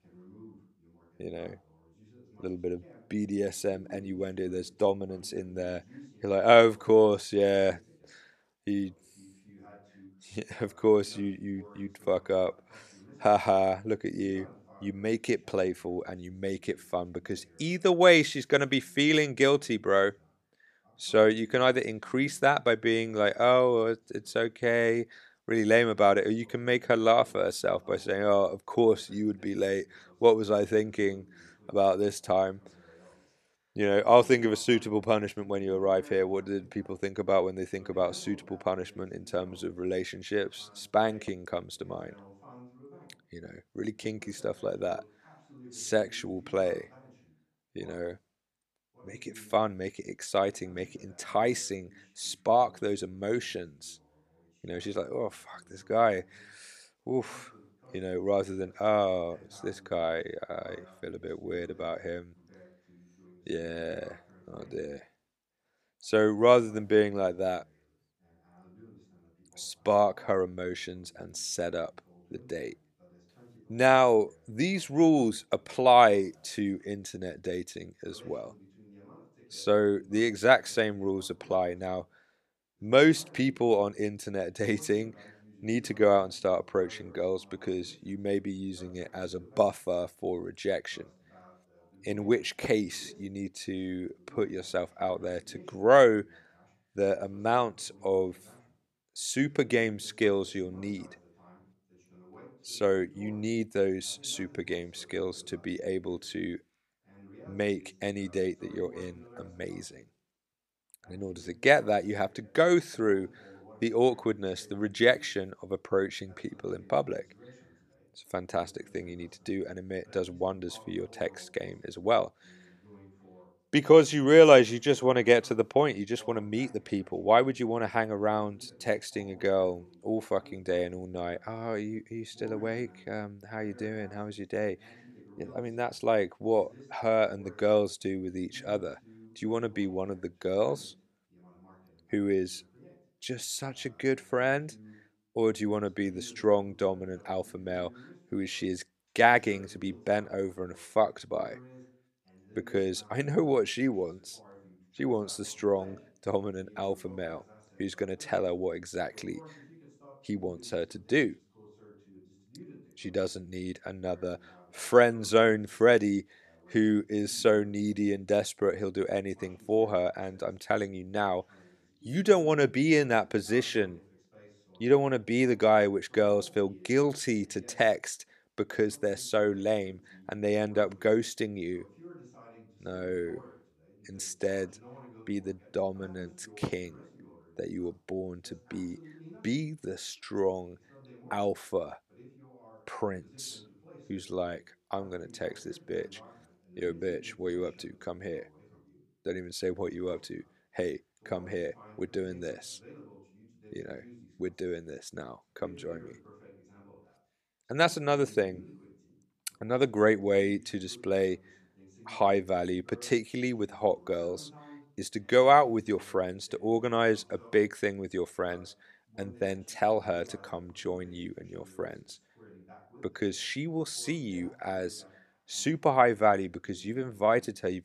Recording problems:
voice in the background; faint; throughout; 25 dB below the speech

